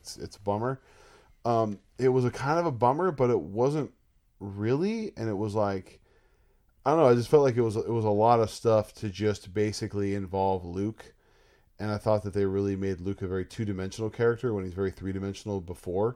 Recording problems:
none

